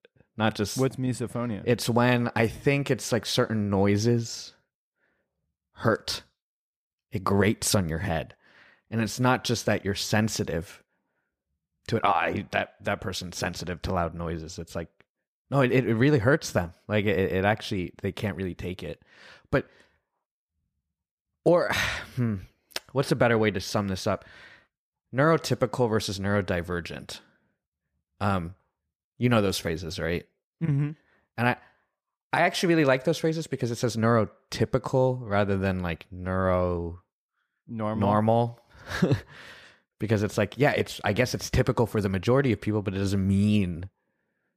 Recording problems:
none

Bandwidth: 15 kHz